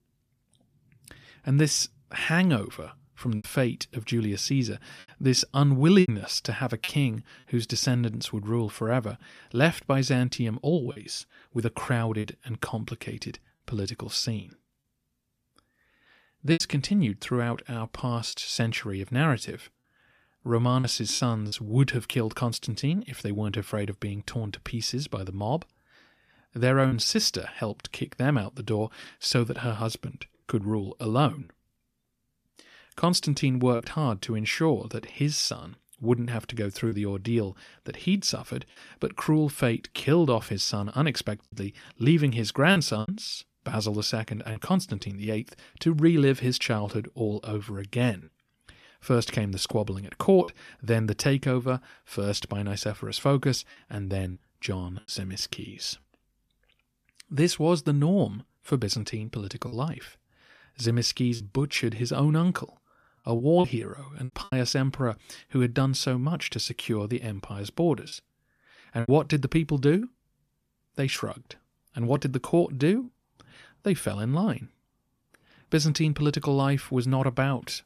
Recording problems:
choppy; occasionally; 3% of the speech affected

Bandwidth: 14.5 kHz